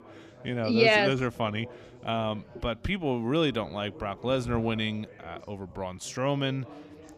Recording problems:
background chatter; faint; throughout; 4 voices, 20 dB below the speech

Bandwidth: 15 kHz